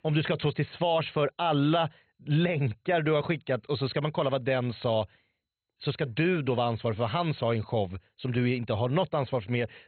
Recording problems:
garbled, watery; badly; nothing above 4 kHz

